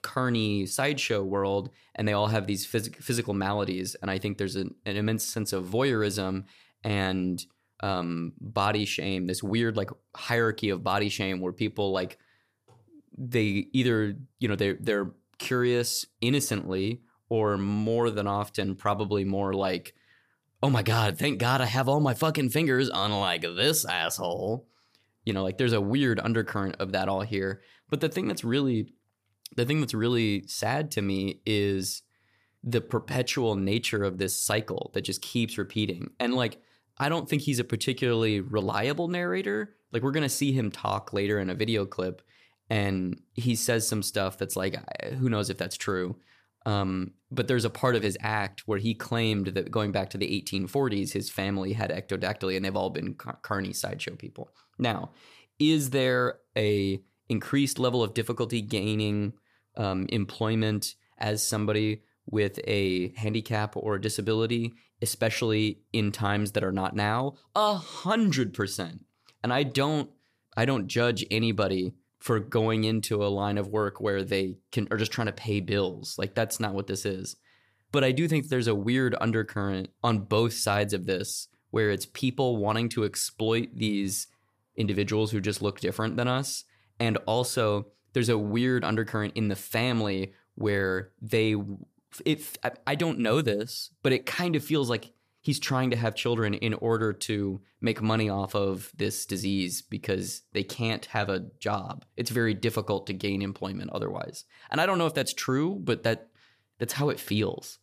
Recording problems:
none

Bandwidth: 14.5 kHz